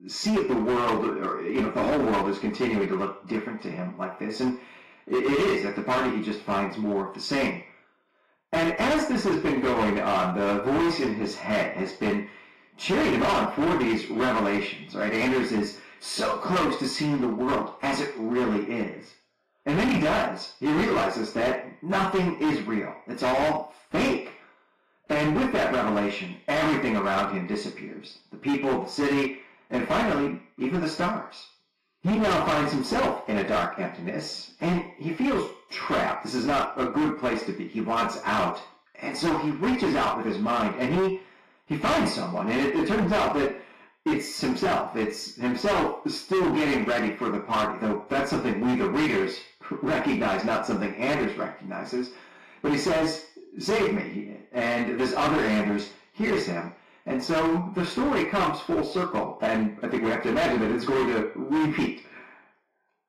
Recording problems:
distortion; heavy; 15% of the sound clipped
off-mic speech; far
room echo; noticeable; dies away in 0.5 s
garbled, watery; slightly; nothing above 14 kHz

